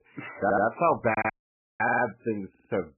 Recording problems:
garbled, watery; badly; nothing above 2.5 kHz
audio stuttering; 4 times, first at 0.5 s
audio cutting out; at 1 s for 0.5 s

